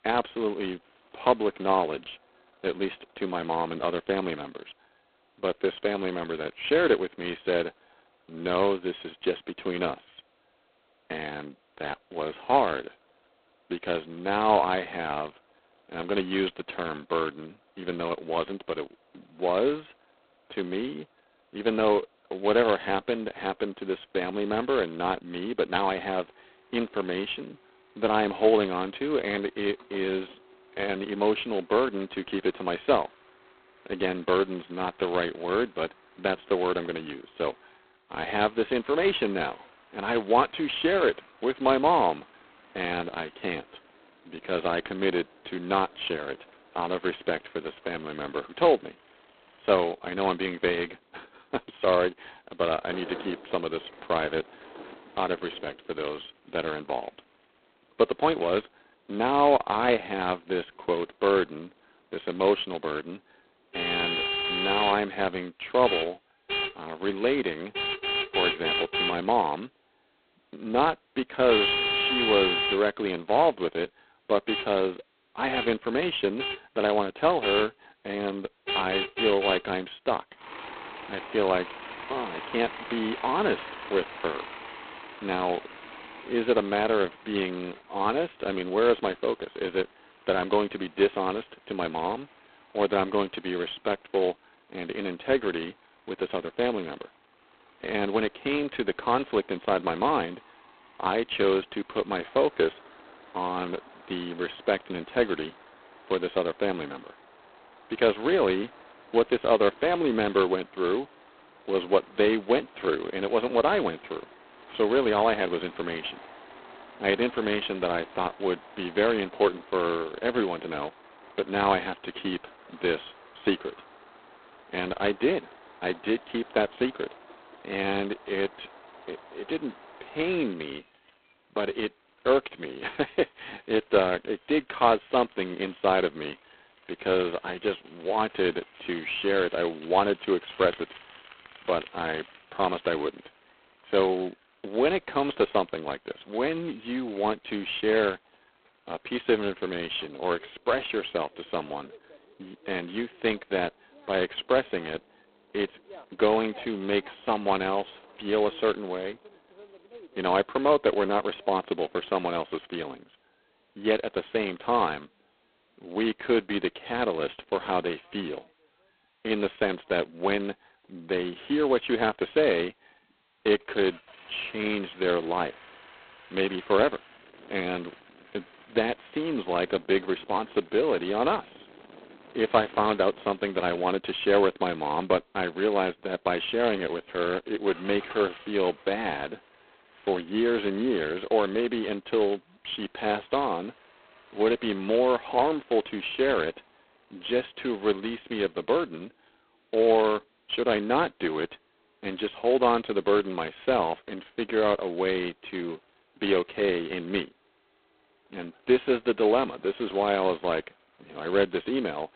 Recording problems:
phone-call audio; poor line; nothing above 4 kHz
traffic noise; loud; throughout; 7 dB below the speech

